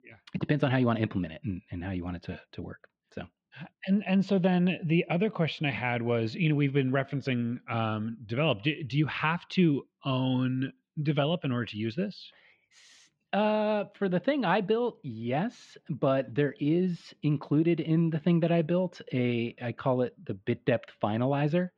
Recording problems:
muffled; very; fading above 3 kHz

